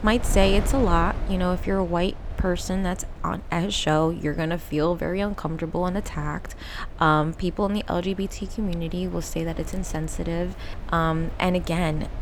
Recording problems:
wind noise on the microphone; occasional gusts; 15 dB below the speech

